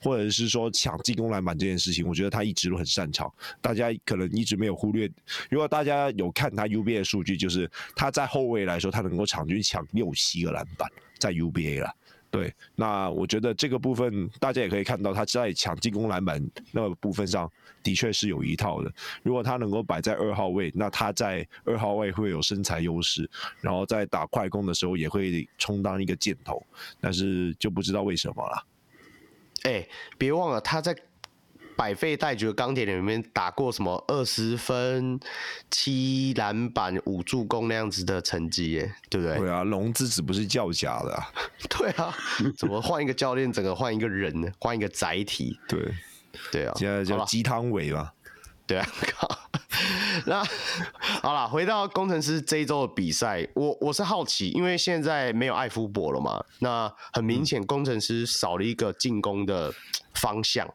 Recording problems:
squashed, flat; heavily

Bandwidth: 18 kHz